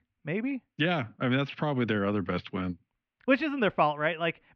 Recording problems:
muffled; very; fading above 2.5 kHz

